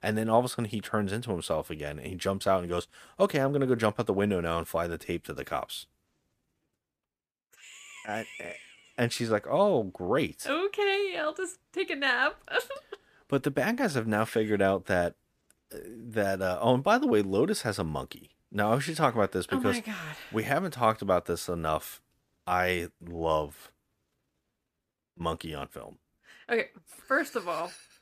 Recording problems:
none

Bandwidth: 14.5 kHz